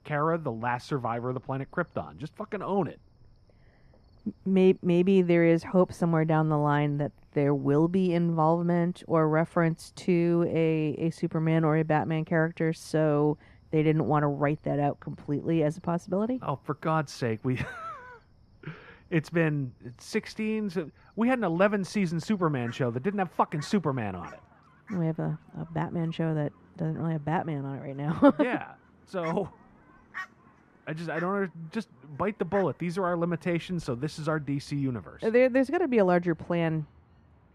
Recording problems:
muffled; slightly; fading above 2.5 kHz
animal sounds; faint; throughout; 25 dB below the speech

